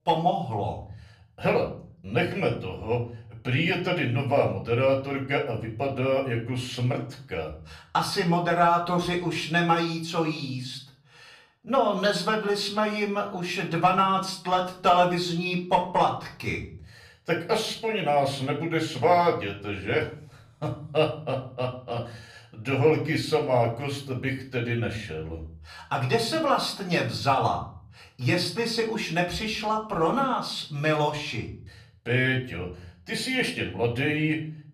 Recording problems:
off-mic speech; far
room echo; slight; dies away in 0.7 s

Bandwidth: 15 kHz